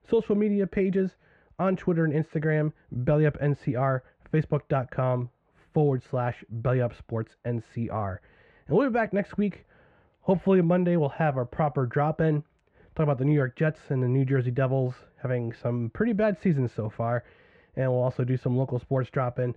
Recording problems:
muffled; very; fading above 1.5 kHz

